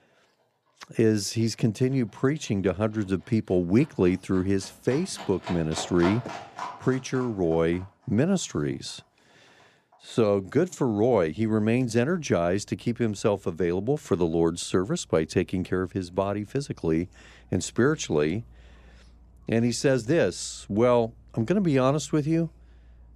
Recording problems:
animal sounds; noticeable; throughout; 20 dB below the speech

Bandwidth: 15 kHz